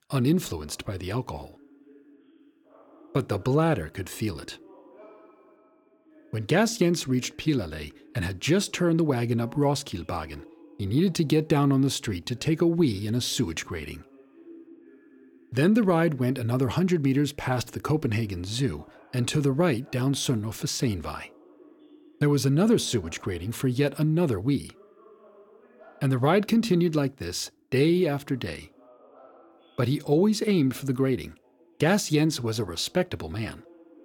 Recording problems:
voice in the background; faint; throughout; 30 dB below the speech

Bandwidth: 17 kHz